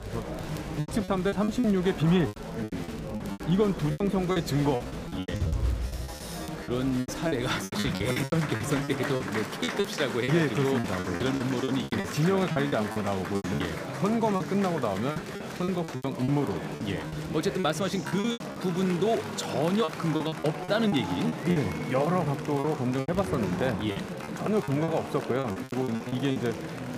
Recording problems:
murmuring crowd; loud; throughout; 6 dB below the speech
crackle, like an old record; faint; 30 dB below the speech
choppy; very; 15% of the speech affected

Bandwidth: 15 kHz